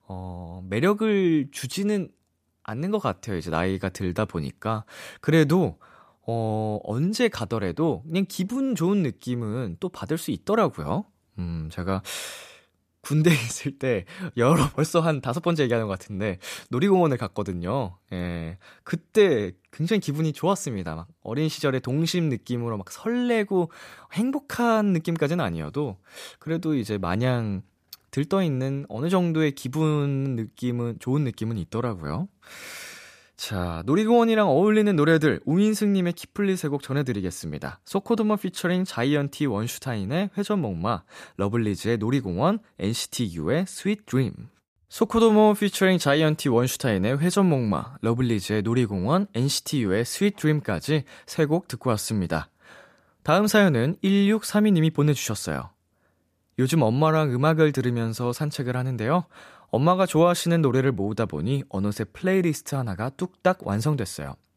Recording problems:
none

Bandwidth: 14.5 kHz